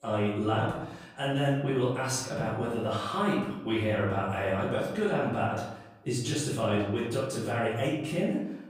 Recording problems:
off-mic speech; far
room echo; noticeable; dies away in 0.8 s

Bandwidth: 15.5 kHz